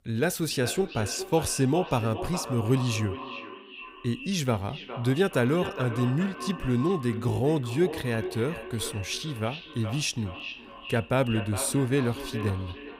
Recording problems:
echo of what is said; strong; throughout; 410 ms later, 10 dB below the speech

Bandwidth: 15.5 kHz